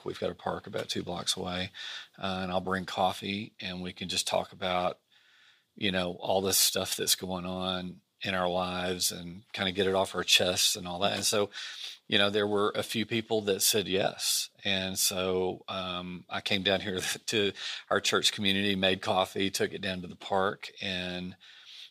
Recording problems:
thin; somewhat; fading below 450 Hz

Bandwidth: 15 kHz